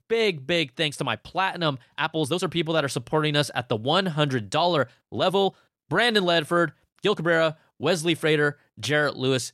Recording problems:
uneven, jittery; strongly; from 1 to 7 s

